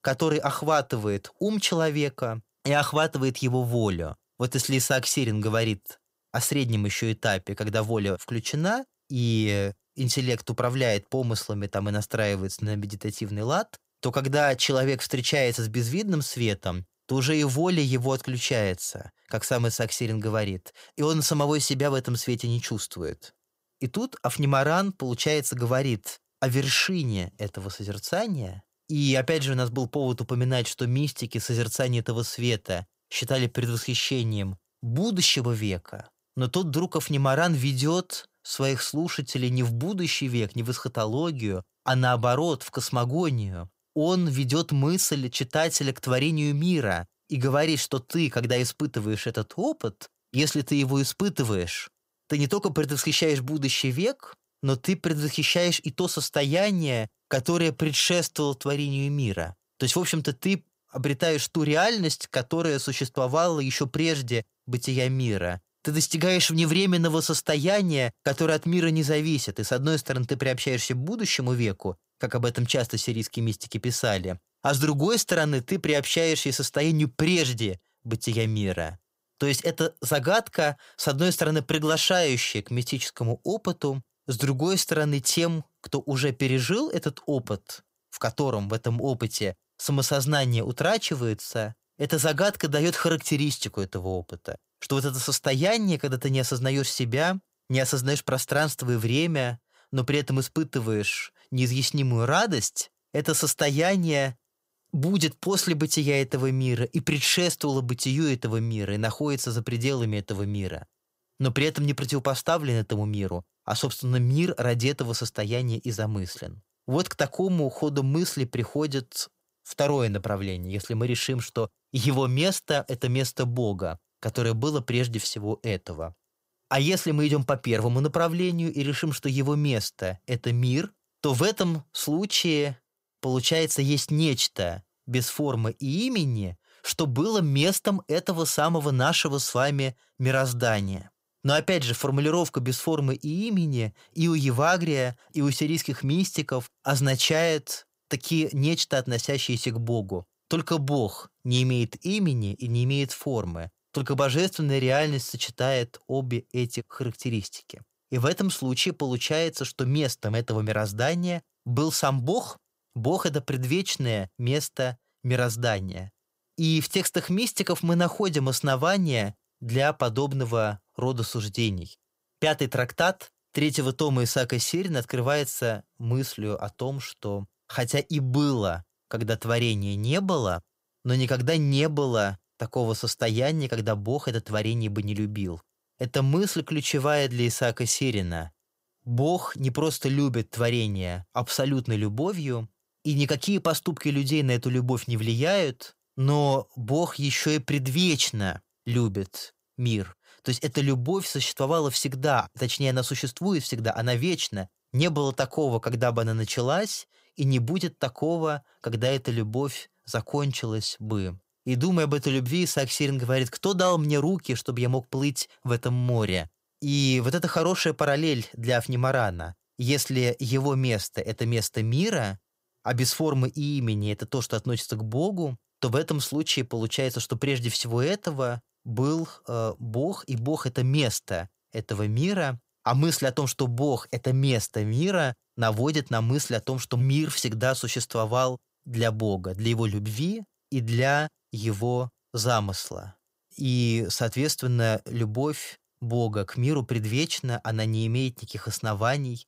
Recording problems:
none

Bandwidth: 15.5 kHz